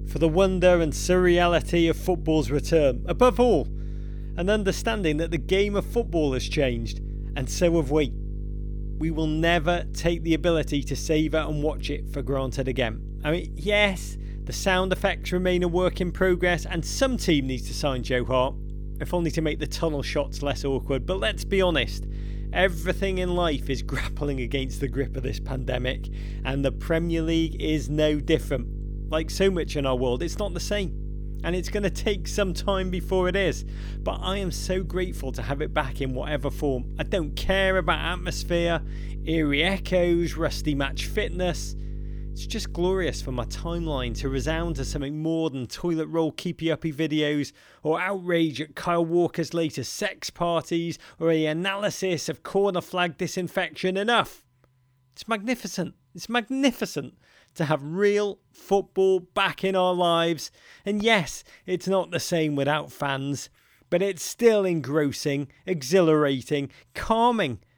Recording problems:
electrical hum; faint; until 45 s; 50 Hz, 25 dB below the speech

